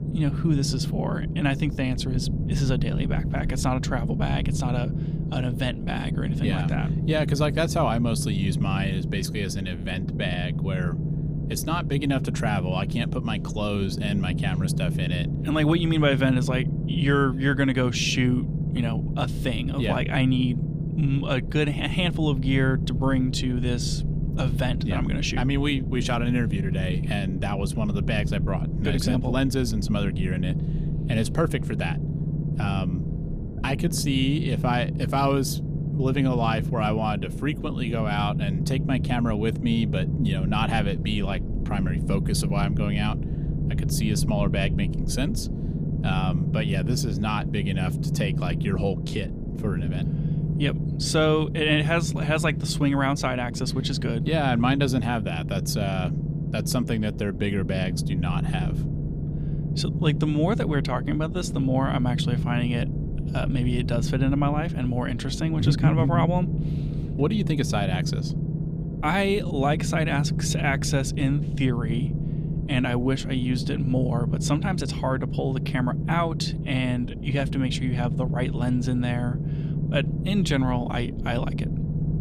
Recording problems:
low rumble; loud; throughout; 9 dB below the speech

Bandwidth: 15 kHz